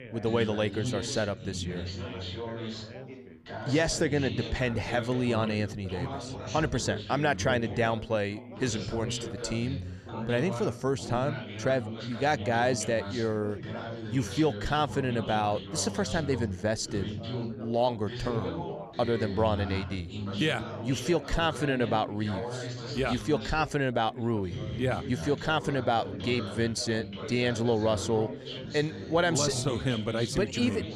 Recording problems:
background chatter; loud; throughout; 4 voices, 8 dB below the speech

